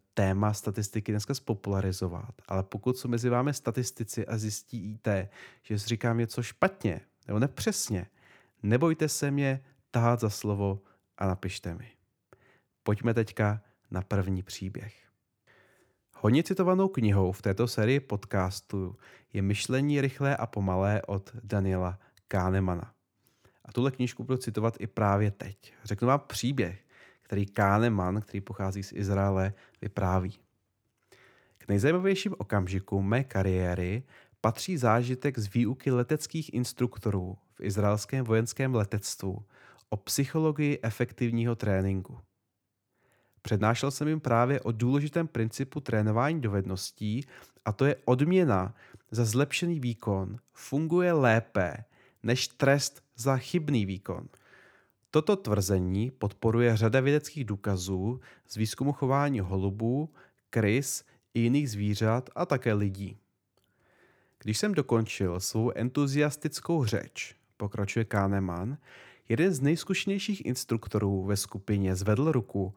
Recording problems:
none

